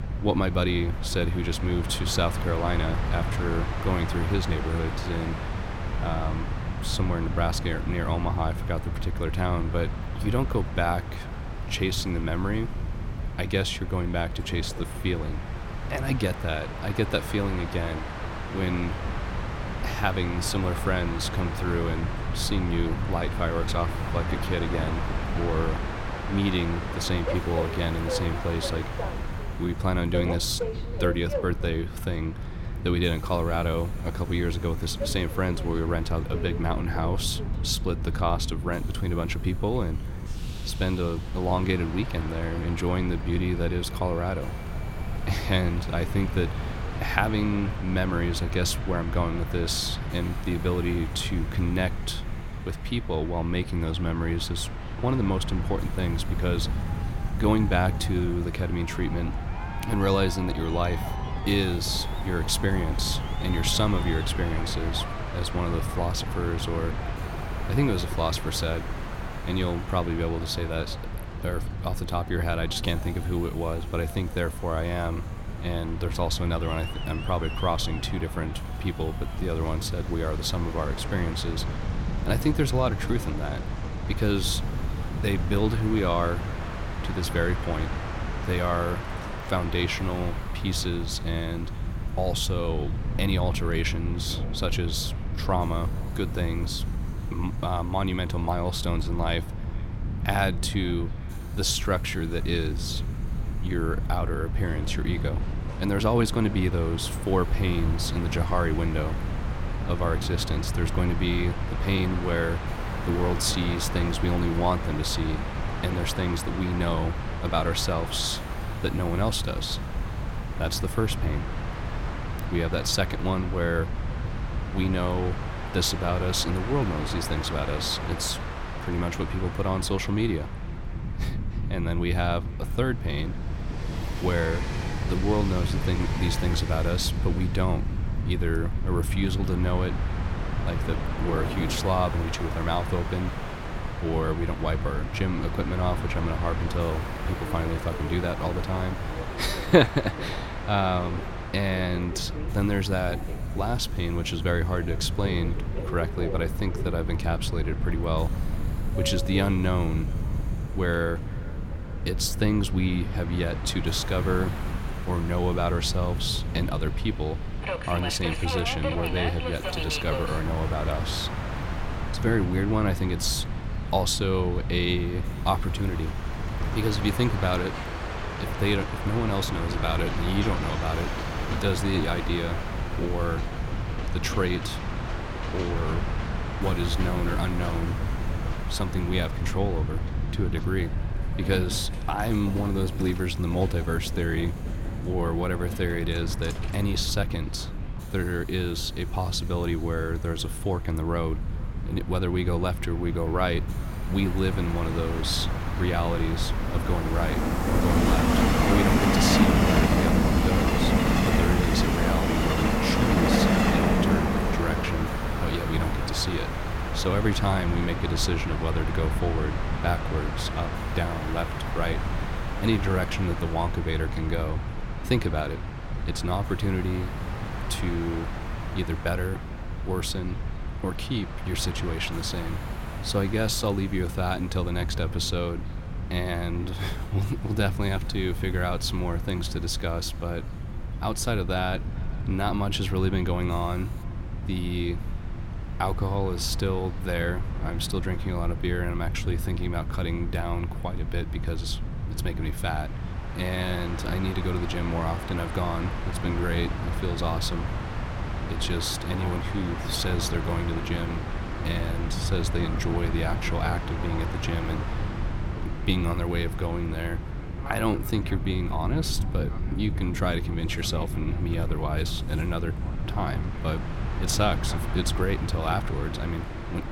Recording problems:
echo of what is said; faint; throughout; 450 ms later, 25 dB below the speech
train or aircraft noise; loud; throughout; 6 dB below the speech
wind noise on the microphone; occasional gusts; 15 dB below the speech
rain or running water; faint; throughout; 25 dB below the speech
hiss; faint; from 27 s to 2:03 and from 2:21 to 4:04; 25 dB below the speech

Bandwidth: 16.5 kHz